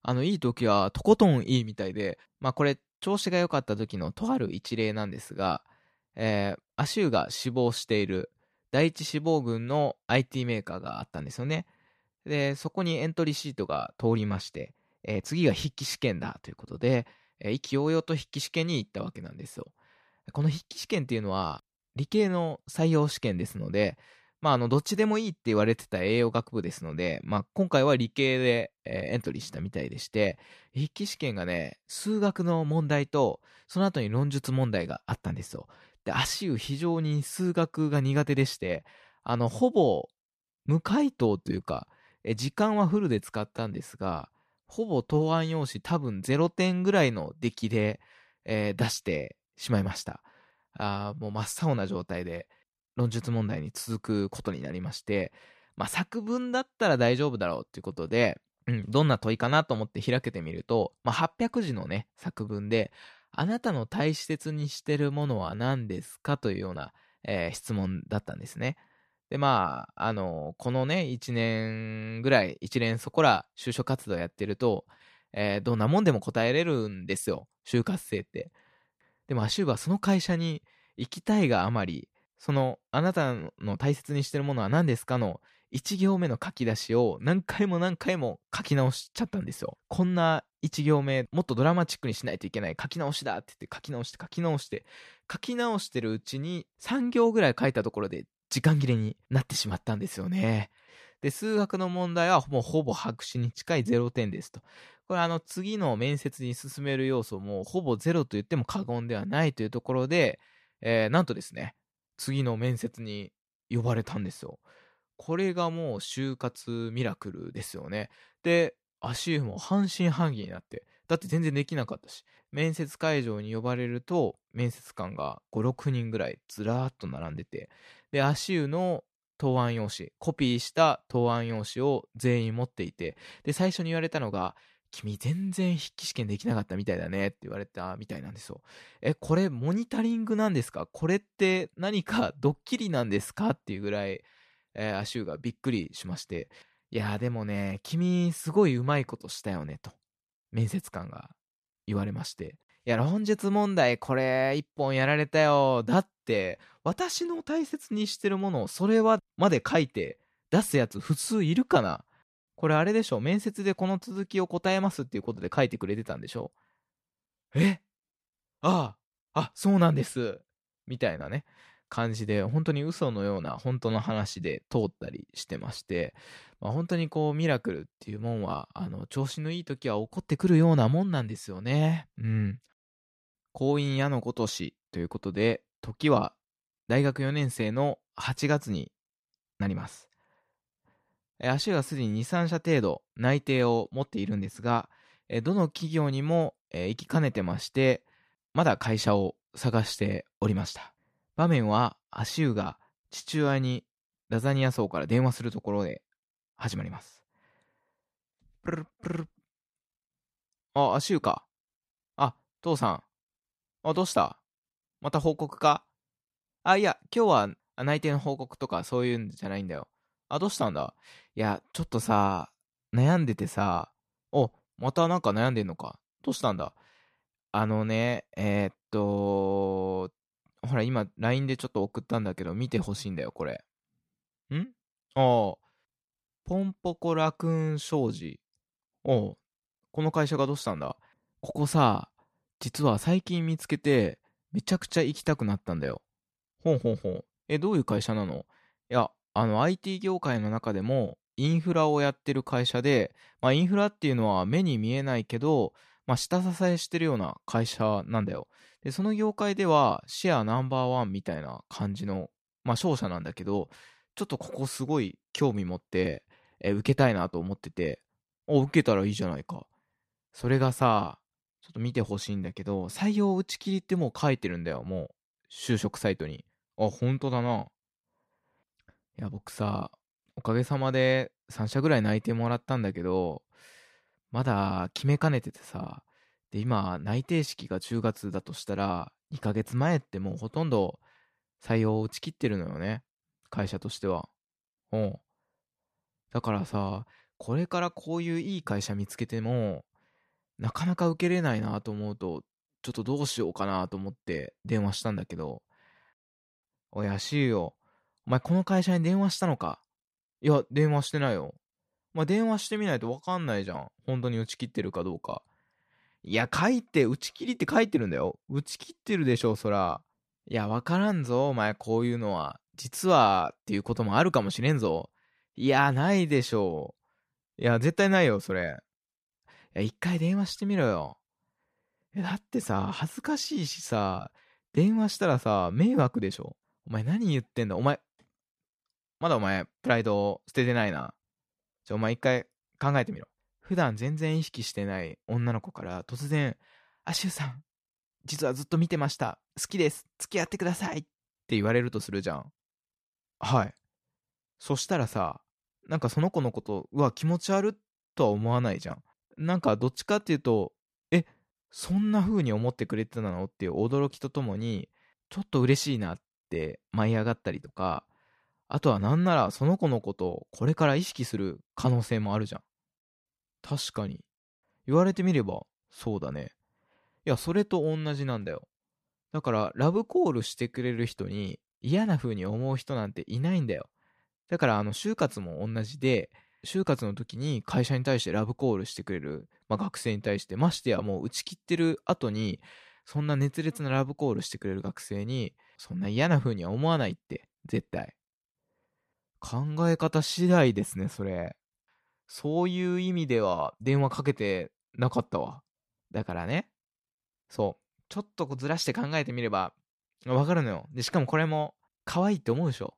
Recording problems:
none

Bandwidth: 14.5 kHz